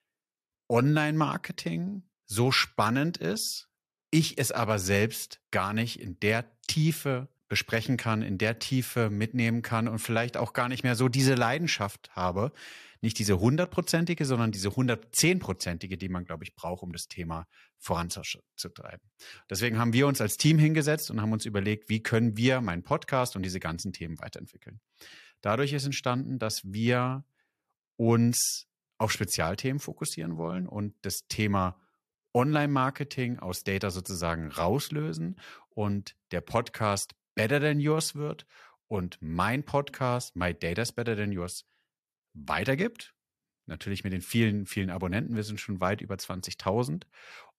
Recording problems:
none

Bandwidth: 14 kHz